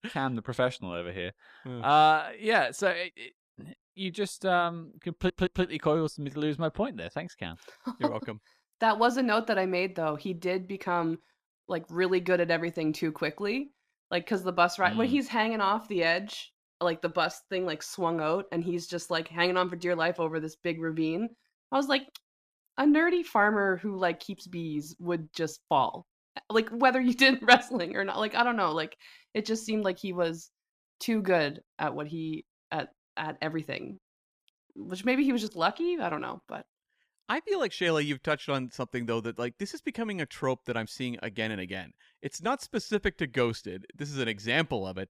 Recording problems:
audio stuttering; at 5 s

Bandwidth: 15 kHz